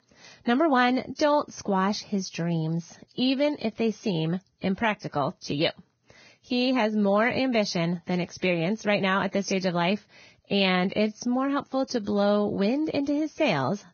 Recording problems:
garbled, watery; badly; nothing above 6.5 kHz

